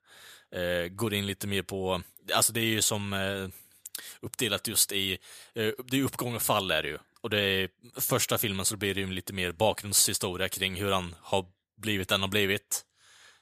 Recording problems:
none

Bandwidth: 14.5 kHz